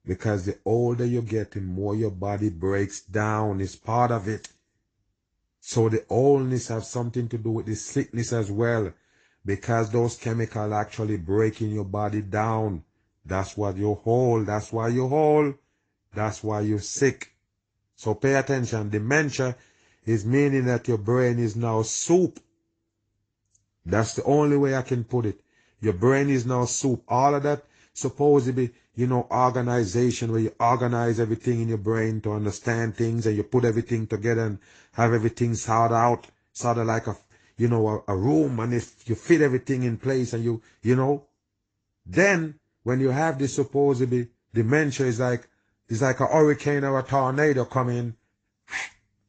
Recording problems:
high frequencies cut off; noticeable; nothing above 7.5 kHz
garbled, watery; slightly

